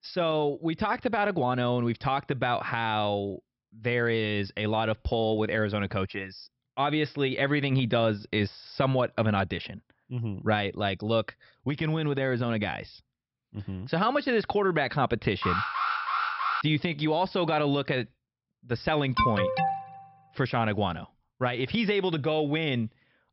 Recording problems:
high frequencies cut off; noticeable; nothing above 5.5 kHz
alarm; loud; from 15 to 17 s and at 19 s; peak 2 dB above the speech

